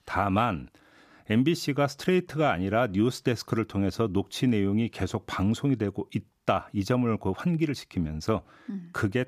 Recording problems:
none

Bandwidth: 14.5 kHz